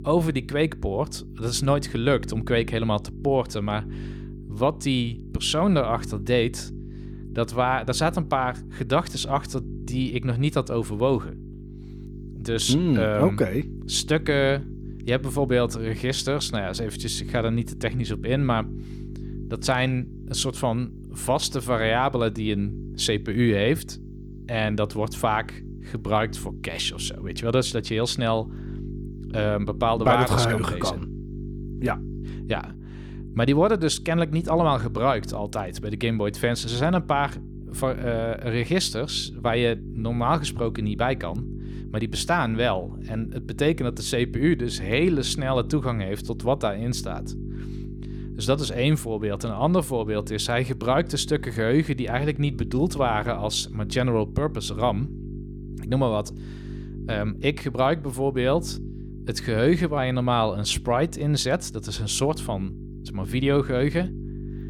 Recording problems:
electrical hum; noticeable; throughout; 50 Hz, 20 dB below the speech

